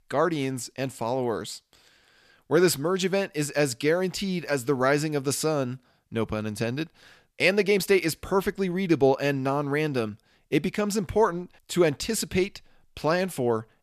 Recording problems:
none

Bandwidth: 14.5 kHz